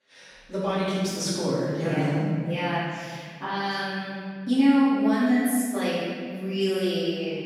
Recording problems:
room echo; strong; dies away in 2 s
off-mic speech; far

